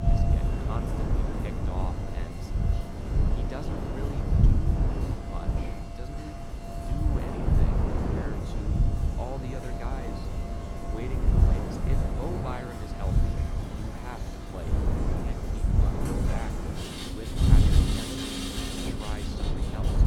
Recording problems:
rain or running water; very loud; throughout; 3 dB above the speech
wind noise on the microphone; heavy; 4 dB above the speech

